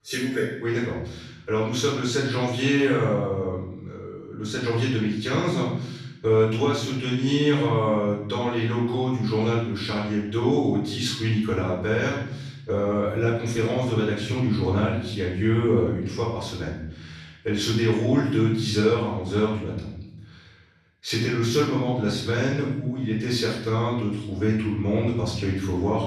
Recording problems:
off-mic speech; far
room echo; noticeable; dies away in 1 s

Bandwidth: 13.5 kHz